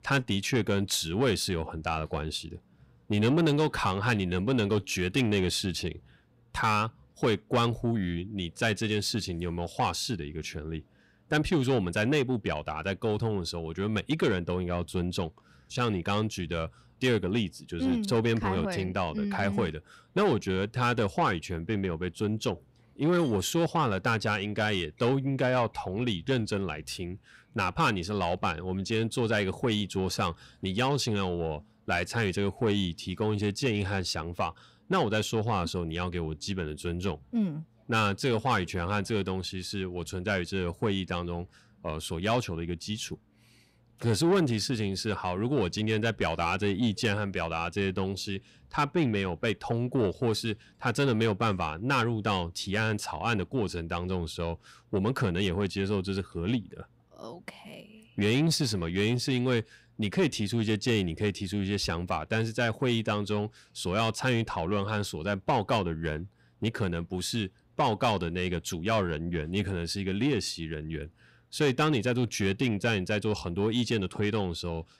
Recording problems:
distortion; slight; 10 dB below the speech

